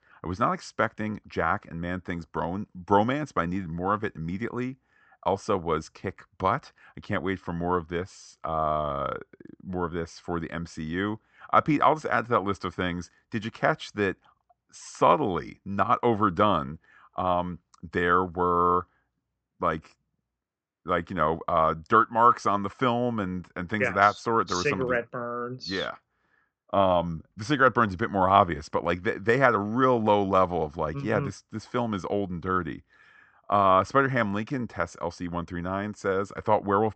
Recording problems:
high frequencies cut off; noticeable; nothing above 8 kHz

